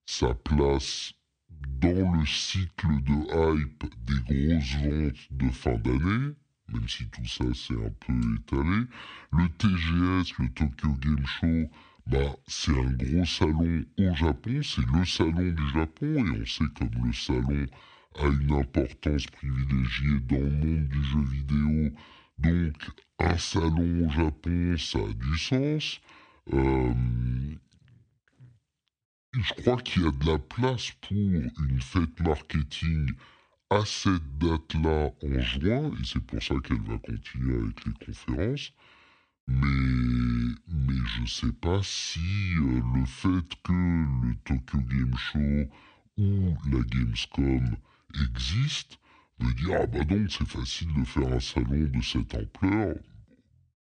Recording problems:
wrong speed and pitch; too slow and too low; 0.6 times normal speed

